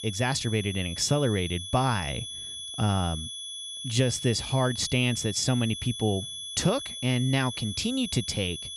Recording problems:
high-pitched whine; loud; throughout; 3.5 kHz, 8 dB below the speech

